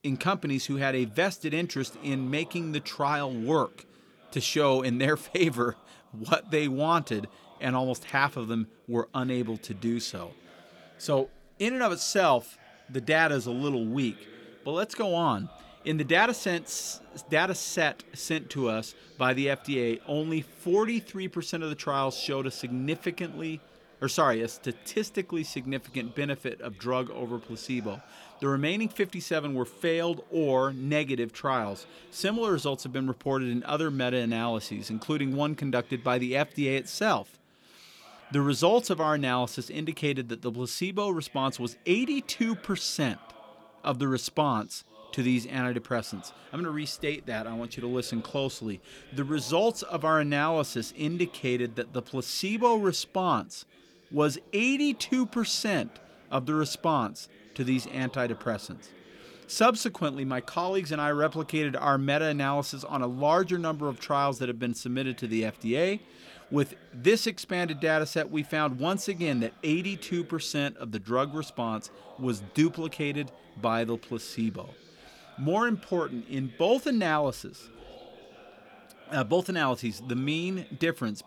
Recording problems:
background chatter; faint; throughout; 4 voices, 25 dB below the speech

